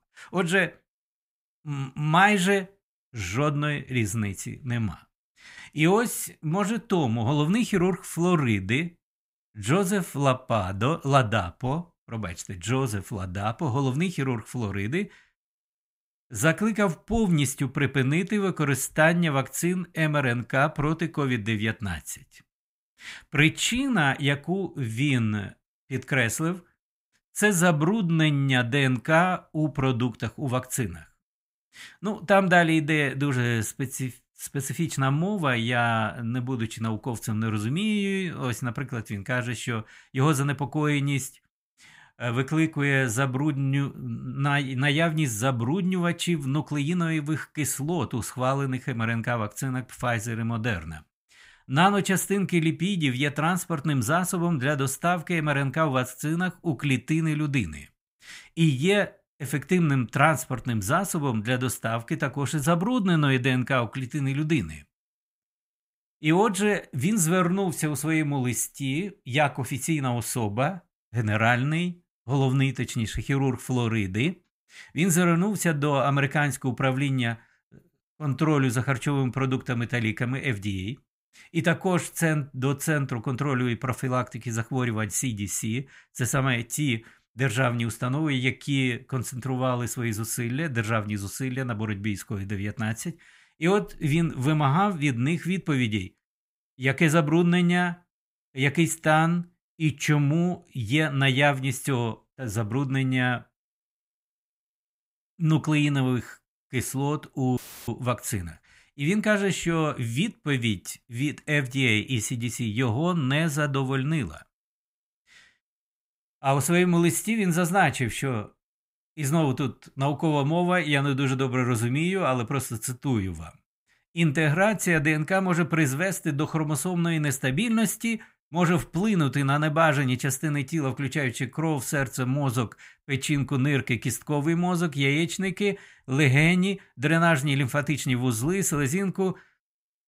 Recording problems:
audio cutting out; filled with static; at 1:48

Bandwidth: 15.5 kHz